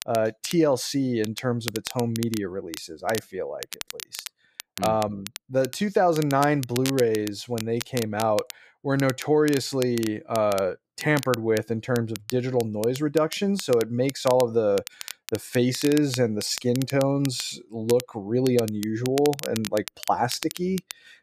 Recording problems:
crackle, like an old record; noticeable; 10 dB below the speech

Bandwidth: 14.5 kHz